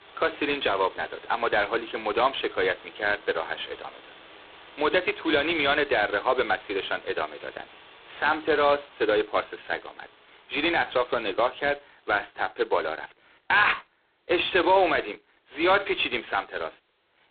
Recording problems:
phone-call audio; poor line; nothing above 4 kHz
wind in the background; faint; throughout; 25 dB below the speech

